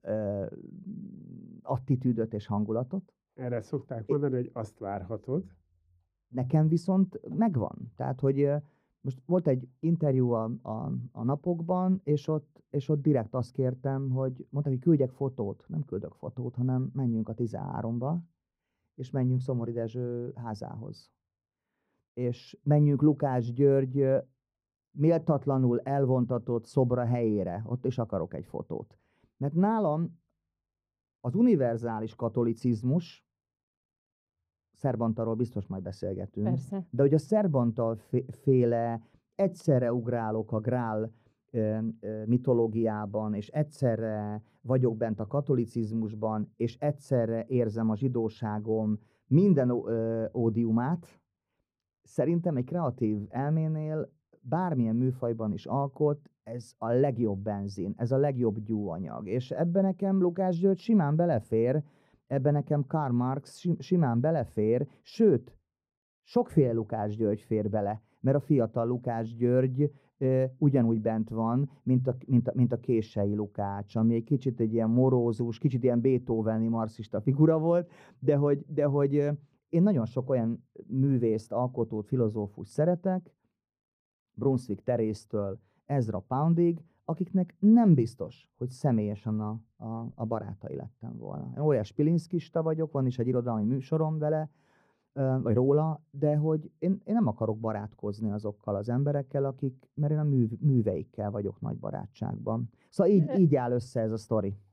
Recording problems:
muffled; very; fading above 1 kHz

